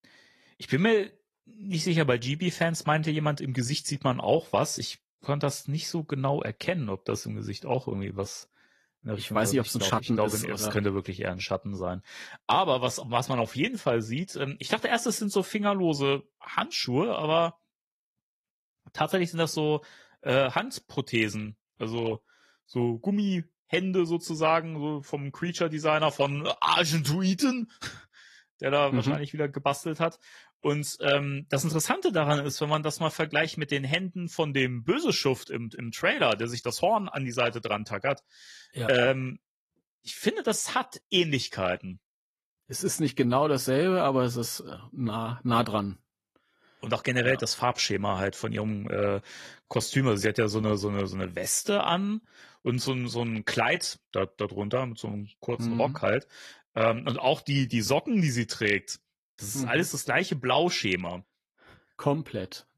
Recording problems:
garbled, watery; slightly; nothing above 13.5 kHz

